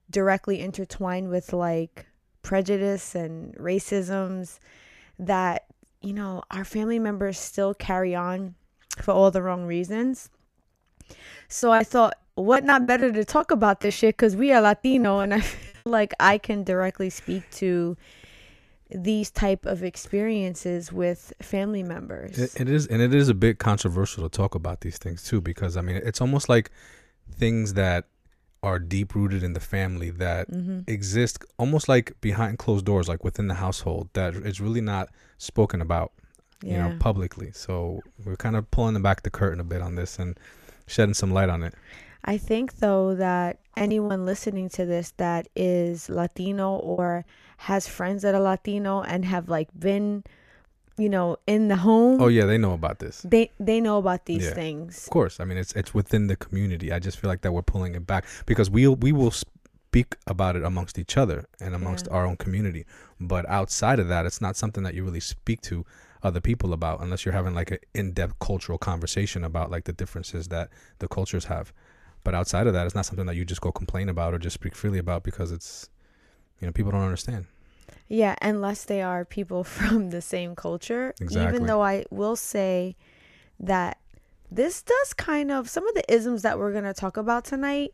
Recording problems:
choppy; very; from 12 to 16 s, at 44 s and at 47 s; 11% of the speech affected

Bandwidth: 14.5 kHz